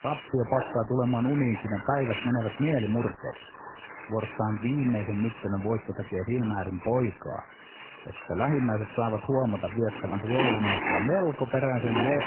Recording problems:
garbled, watery; badly; nothing above 2.5 kHz
household noises; loud; throughout; 8 dB below the speech

